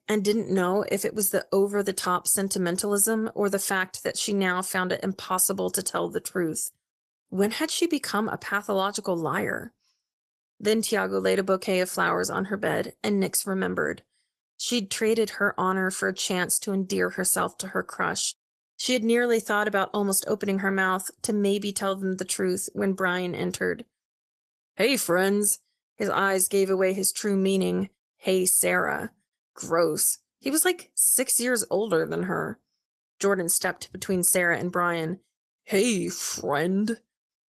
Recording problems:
garbled, watery; slightly; nothing above 13.5 kHz

